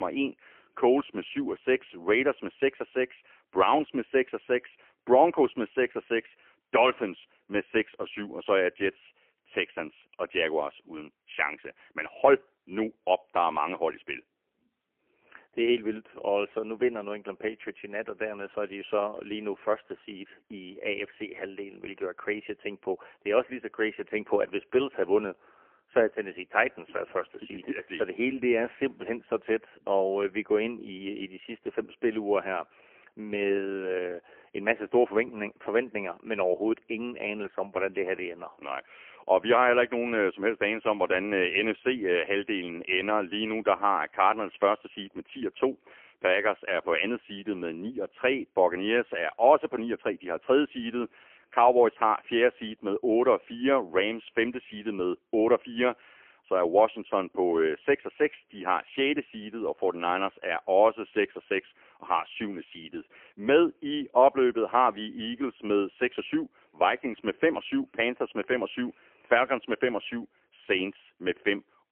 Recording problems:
phone-call audio; poor line; nothing above 3 kHz
abrupt cut into speech; at the start

